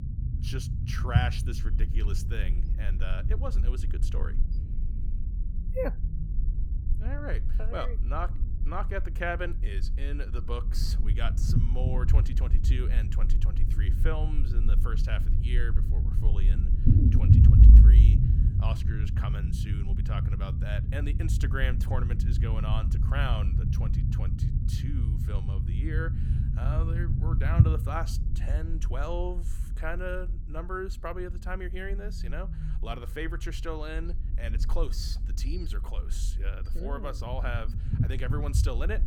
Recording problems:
low rumble; loud; throughout; 4 dB below the speech

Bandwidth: 17 kHz